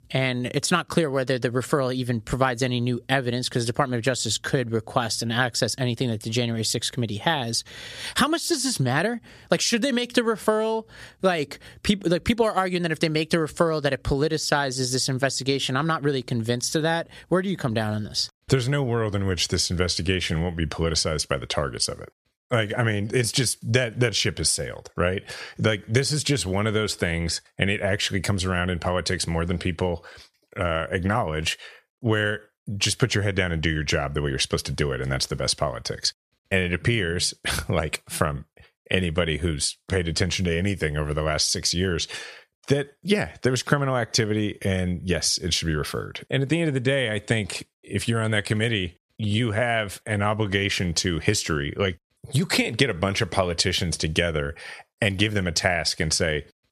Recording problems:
squashed, flat; heavily

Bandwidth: 14.5 kHz